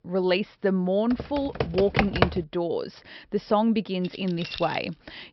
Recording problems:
high frequencies cut off; noticeable; nothing above 5.5 kHz
keyboard typing; loud; from 1 to 2.5 s; peak 3 dB above the speech
jangling keys; noticeable; at 4 s; peak 9 dB below the speech

